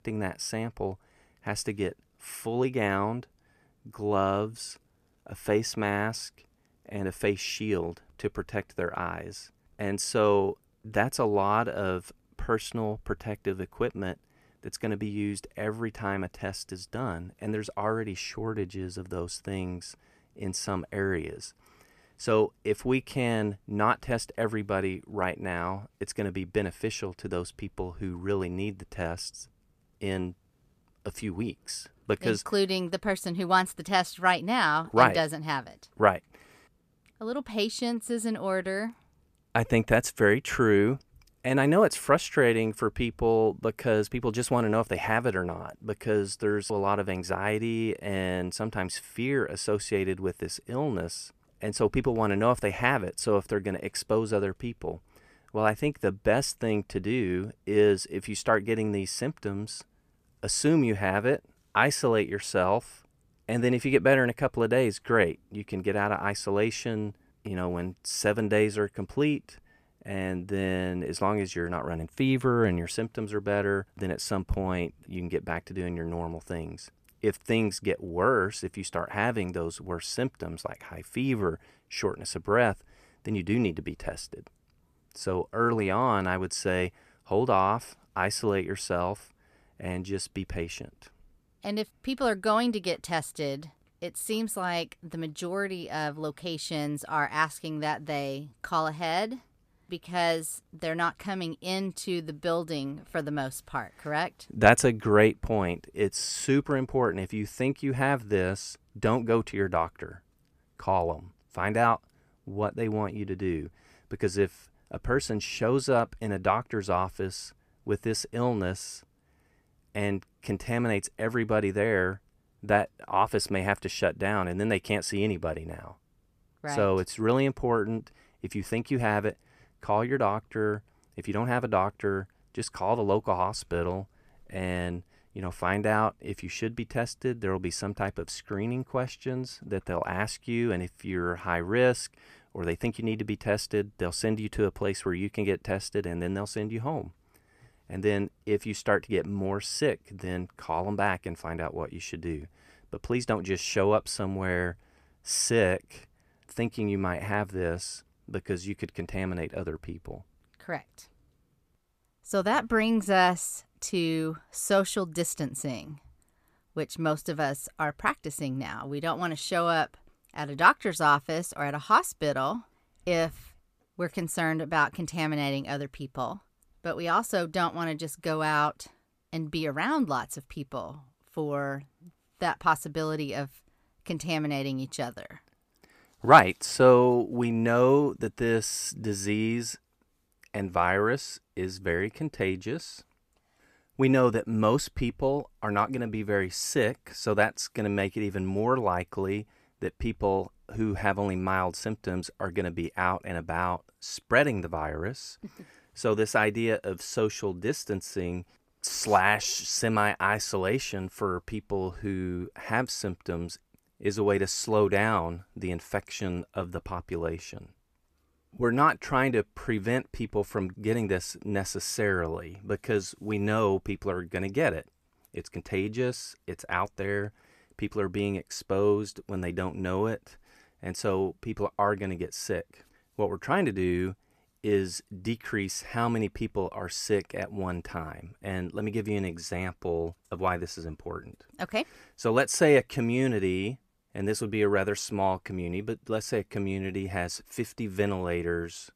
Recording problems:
none

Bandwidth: 14.5 kHz